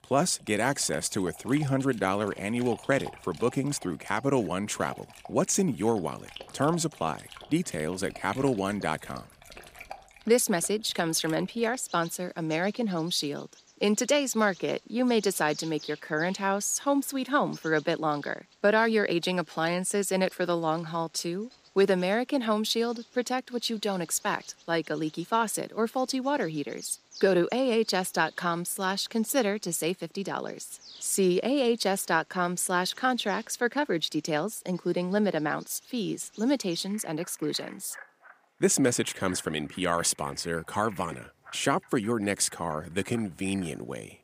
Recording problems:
animal sounds; faint; throughout; 20 dB below the speech

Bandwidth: 15 kHz